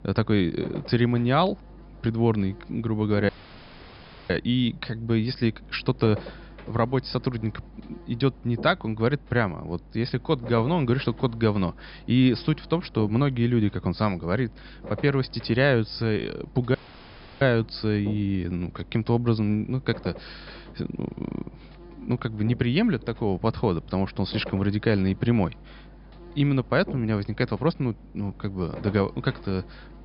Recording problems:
high frequencies cut off; noticeable; nothing above 5.5 kHz
electrical hum; noticeable; throughout; 50 Hz, 20 dB below the speech
audio cutting out; at 3.5 s for 1 s and at 17 s for 0.5 s

